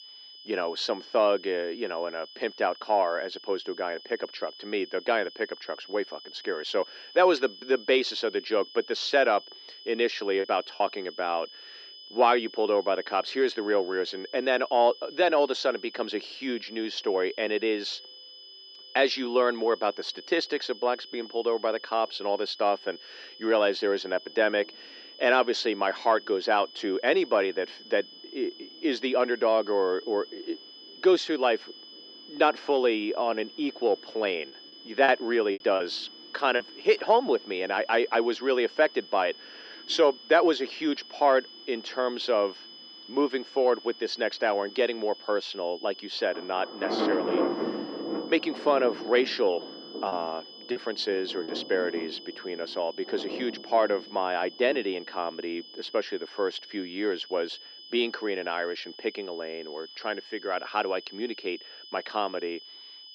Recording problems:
thin; somewhat; fading below 350 Hz
muffled; very slightly; fading above 4 kHz
rain or running water; loud; throughout; 9 dB below the speech
high-pitched whine; noticeable; throughout; 5 kHz, 15 dB below the speech
choppy; very; at 10 s, from 34 to 37 s and from 50 to 51 s; 8% of the speech affected

